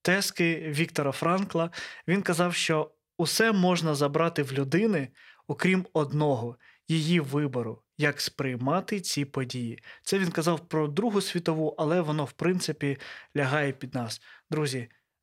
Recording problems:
none

